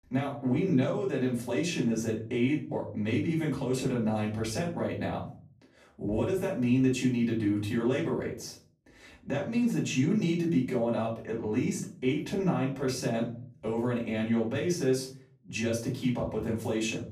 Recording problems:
off-mic speech; far
room echo; slight; dies away in 0.5 s

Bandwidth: 14.5 kHz